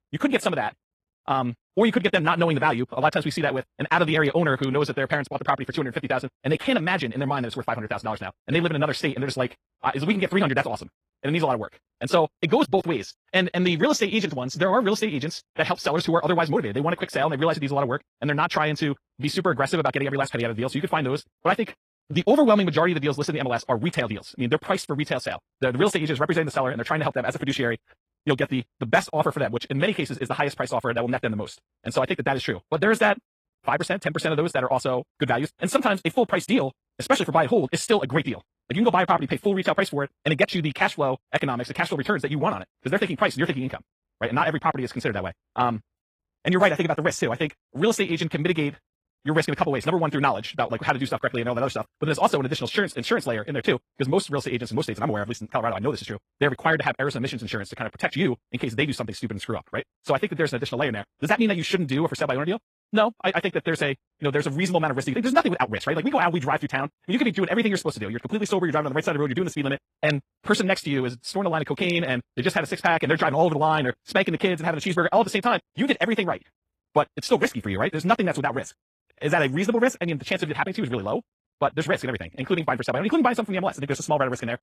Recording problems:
wrong speed, natural pitch; too fast; 1.7 times normal speed
garbled, watery; slightly

